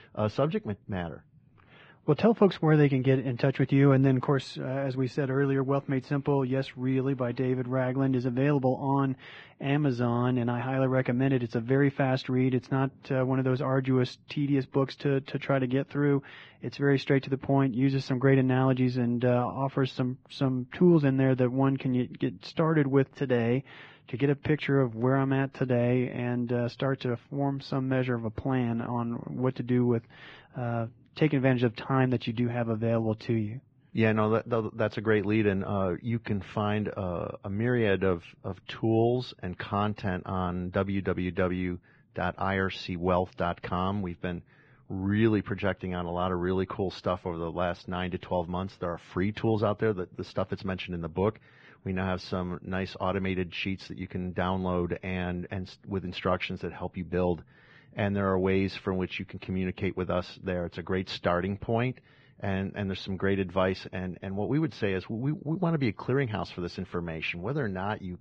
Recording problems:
garbled, watery; badly
muffled; slightly; fading above 3 kHz

